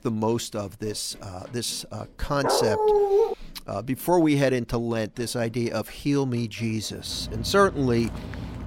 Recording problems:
machinery noise; noticeable; throughout; 20 dB below the speech
dog barking; loud; at 2.5 s; peak 6 dB above the speech
footsteps; faint; at 8 s; peak 15 dB below the speech

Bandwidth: 16 kHz